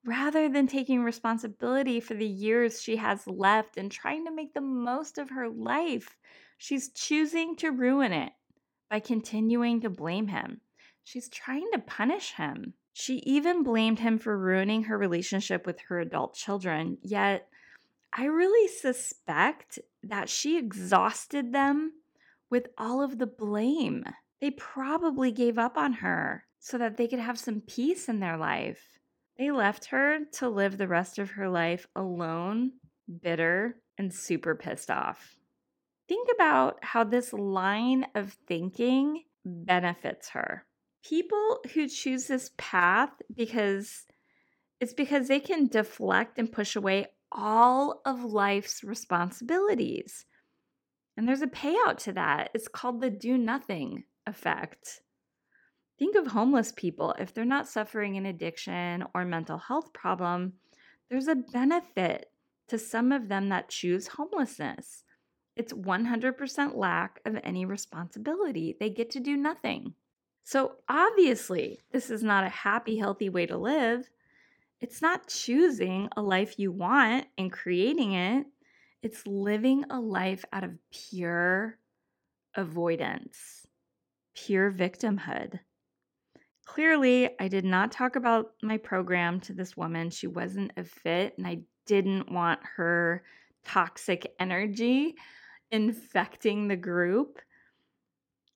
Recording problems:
none

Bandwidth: 17 kHz